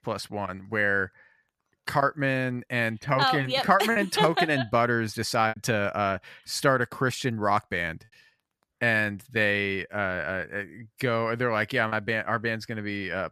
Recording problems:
choppy; occasionally; 2% of the speech affected

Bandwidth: 14.5 kHz